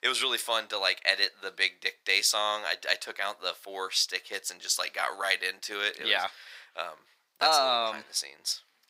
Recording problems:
thin; very; fading below 1 kHz

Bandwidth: 15.5 kHz